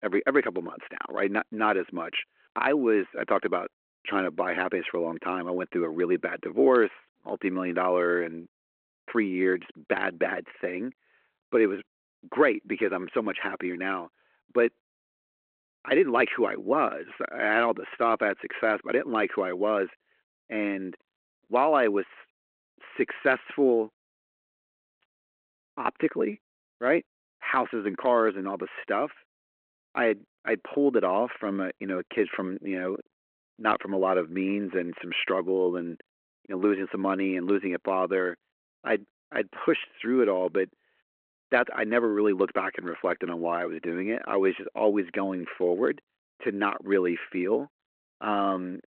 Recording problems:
phone-call audio

